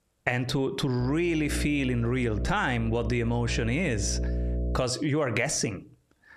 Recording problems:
squashed, flat; heavily
electrical hum; noticeable; from 1 to 5 s; 60 Hz, 15 dB below the speech

